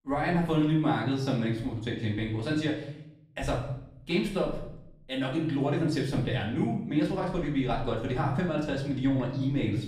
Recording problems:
off-mic speech; far
room echo; noticeable; dies away in 0.7 s

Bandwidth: 15 kHz